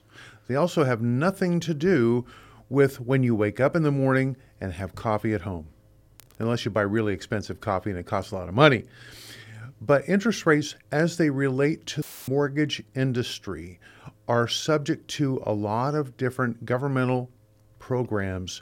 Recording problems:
audio cutting out; filled with static; at 12 s

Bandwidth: 16.5 kHz